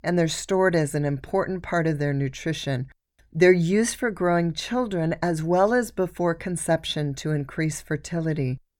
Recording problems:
none

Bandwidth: 18 kHz